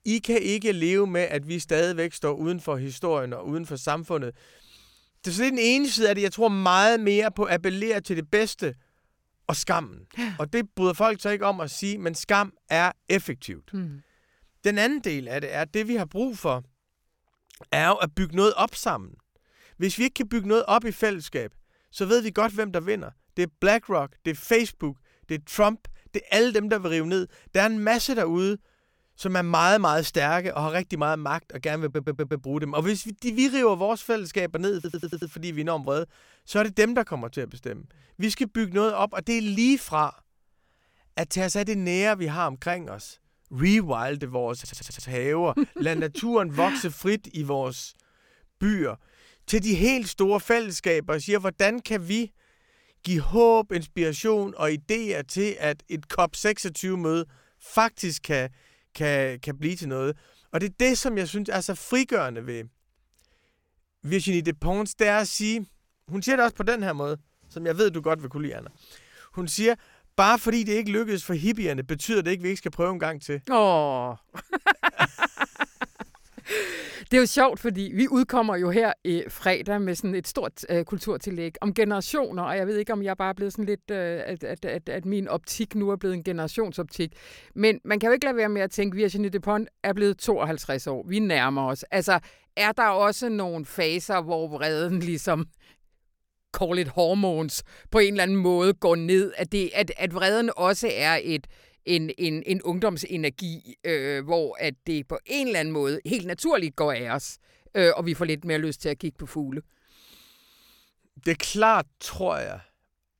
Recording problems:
audio stuttering; at 32 s, at 35 s and at 45 s

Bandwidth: 17 kHz